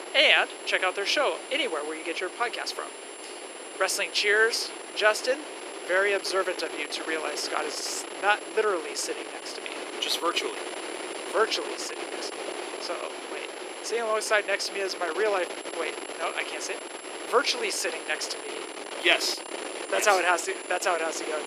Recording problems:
thin; very; fading below 350 Hz
high-pitched whine; noticeable; throughout; 10.5 kHz, 15 dB below the speech
wind noise on the microphone; occasional gusts; 10 dB below the speech
abrupt cut into speech; at the end

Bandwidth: 14.5 kHz